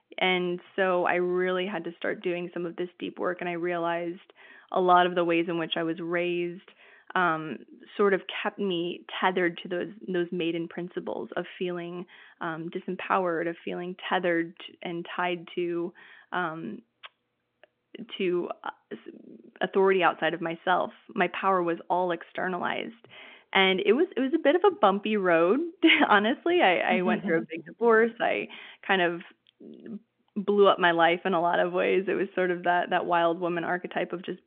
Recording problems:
phone-call audio; nothing above 3.5 kHz

